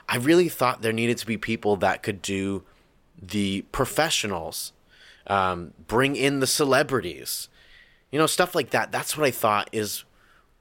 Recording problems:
none

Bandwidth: 16.5 kHz